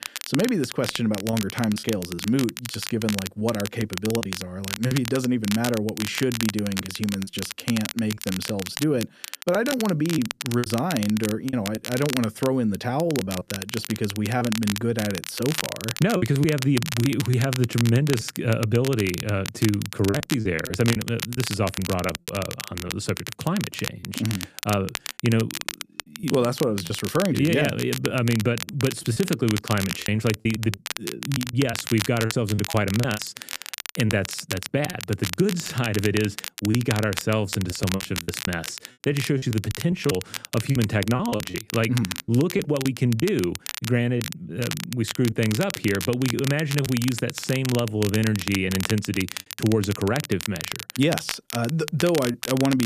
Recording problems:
crackle, like an old record; loud; 8 dB below the speech
choppy; very; 7% of the speech affected
abrupt cut into speech; at the end

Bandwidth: 14.5 kHz